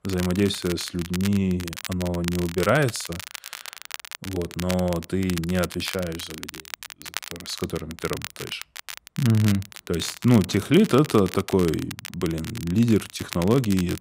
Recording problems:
crackle, like an old record; noticeable; 10 dB below the speech

